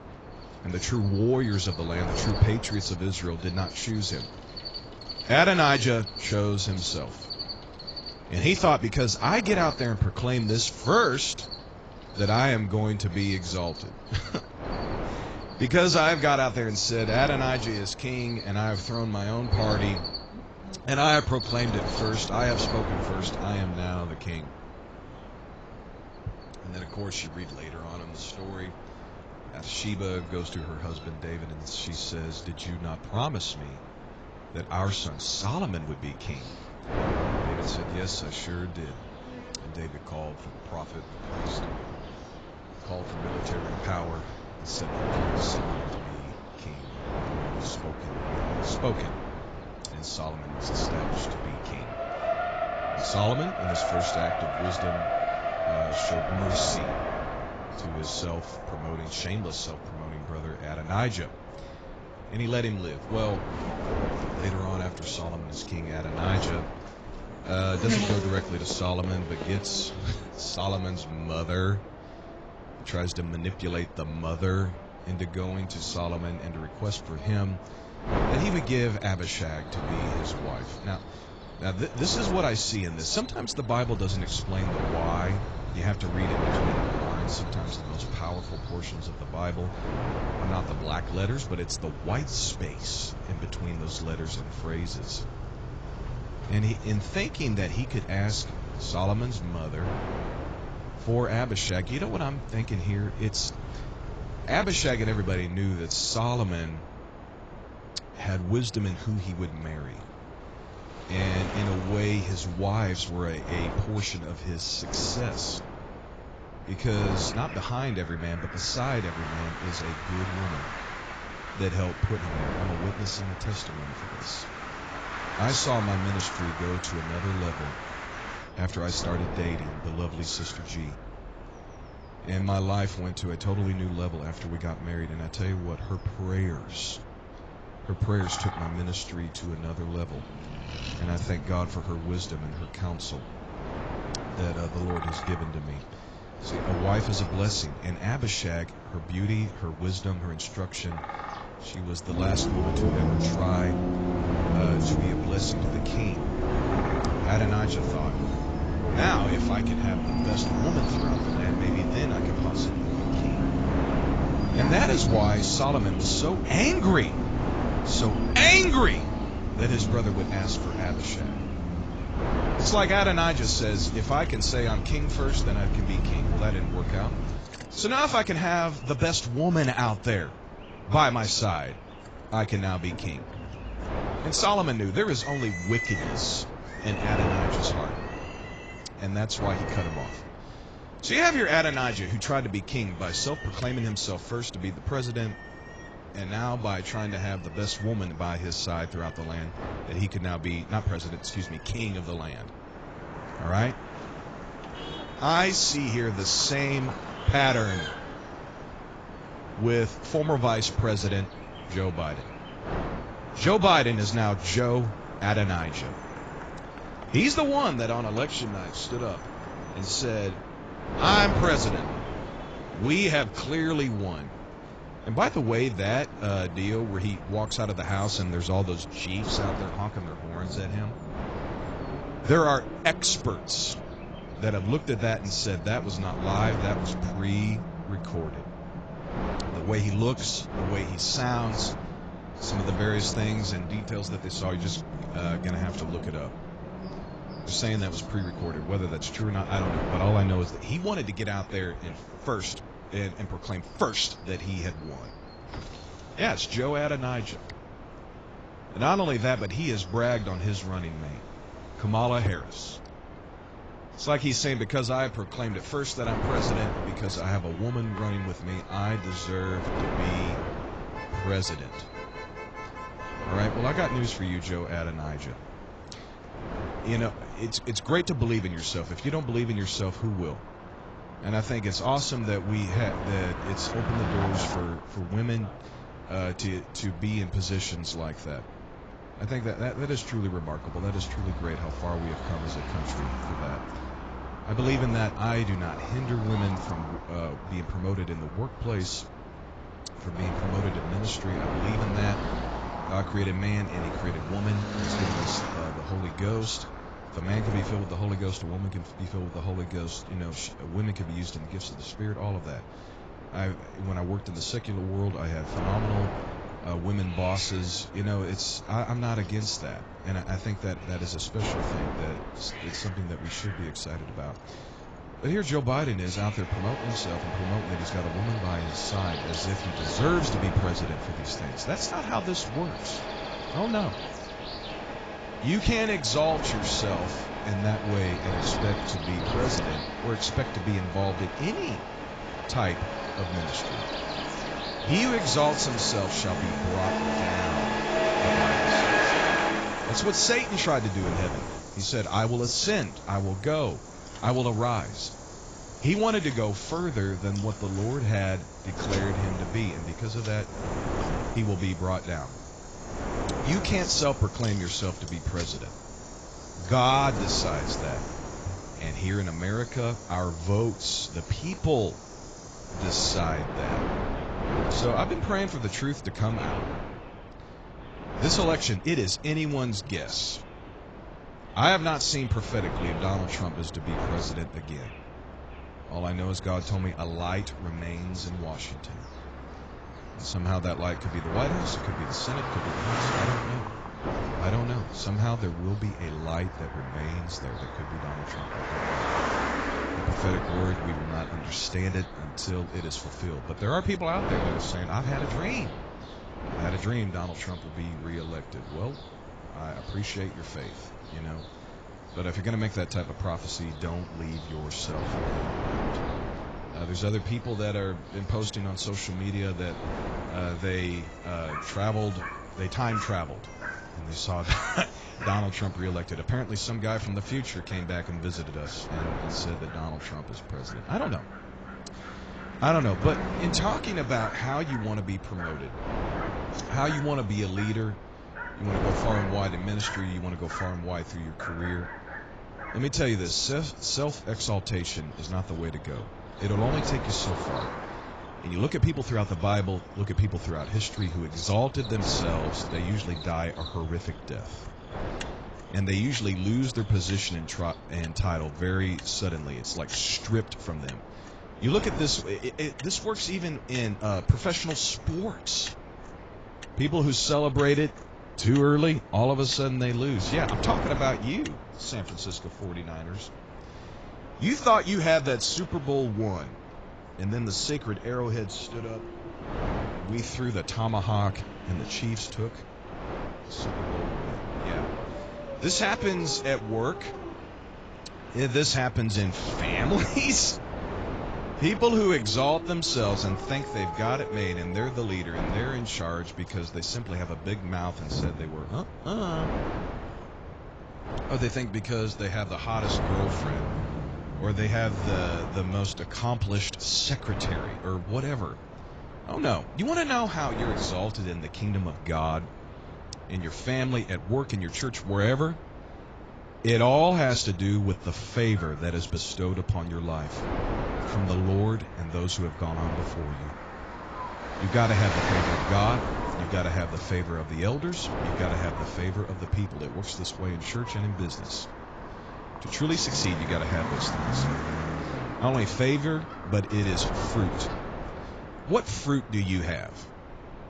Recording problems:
garbled, watery; badly; nothing above 7.5 kHz
wind noise on the microphone; heavy; 10 dB below the speech
traffic noise; loud; throughout; 6 dB below the speech
animal sounds; noticeable; throughout; 15 dB below the speech

